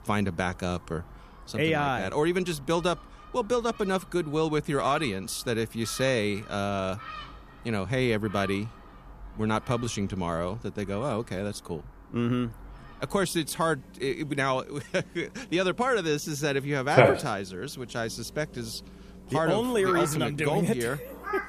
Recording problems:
animal sounds; loud; throughout; 2 dB below the speech

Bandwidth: 14.5 kHz